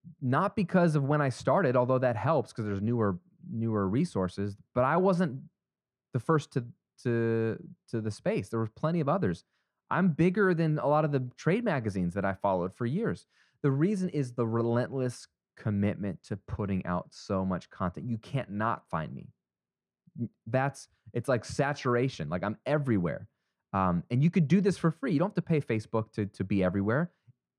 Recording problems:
muffled; very; fading above 3 kHz

